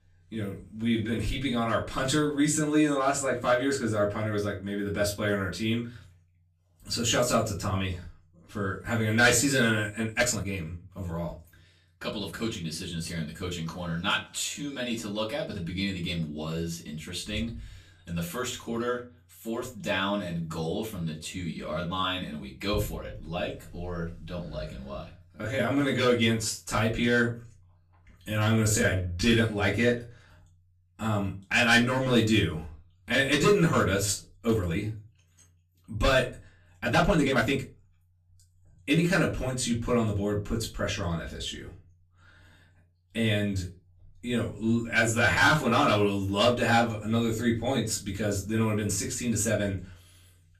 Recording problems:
off-mic speech; far
room echo; very slight; dies away in 0.2 s
uneven, jittery; strongly; from 0.5 to 46 s

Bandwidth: 14.5 kHz